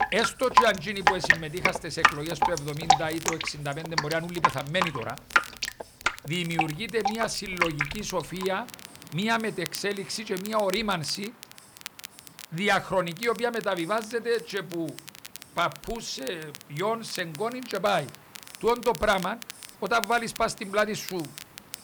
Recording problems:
rain or running water; very loud; throughout; 2 dB above the speech
crackle, like an old record; noticeable; 15 dB below the speech
hiss; faint; throughout; 25 dB below the speech

